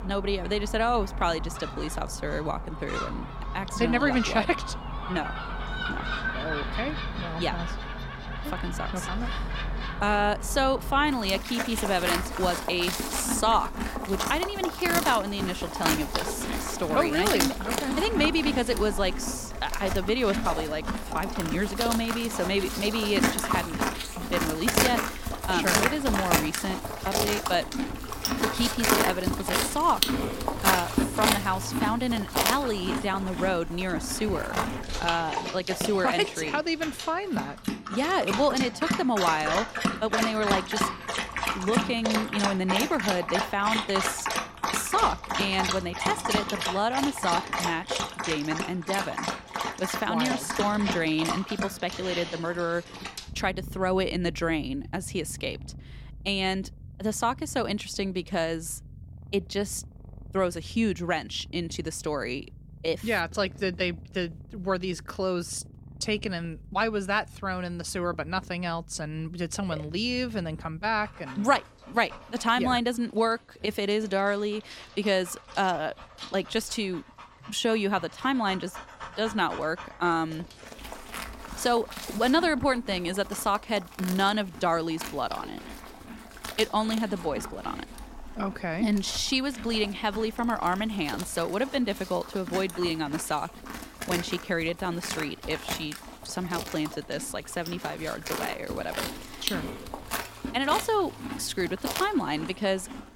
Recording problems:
animal sounds; loud; throughout; 3 dB below the speech

